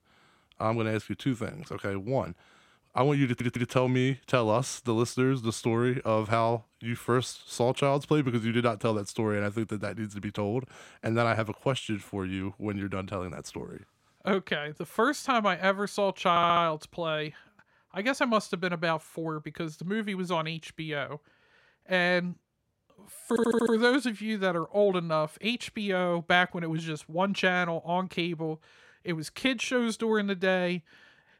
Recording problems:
audio stuttering; at 3.5 s, at 16 s and at 23 s

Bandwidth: 16 kHz